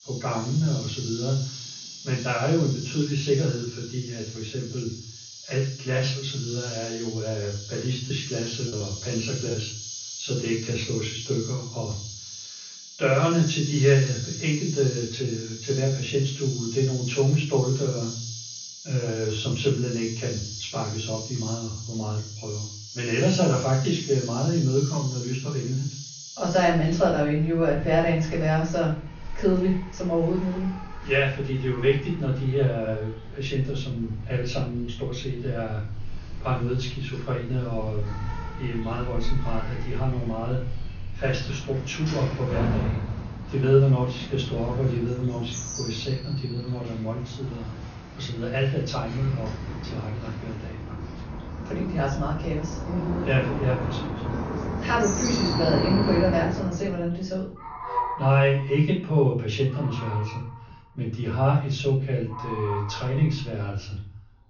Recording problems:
off-mic speech; far
room echo; noticeable; dies away in 0.4 s
high frequencies cut off; noticeable; nothing above 6.5 kHz
animal sounds; loud; throughout; 9 dB below the speech
choppy; very; from 8 to 9.5 s; 6% of the speech affected

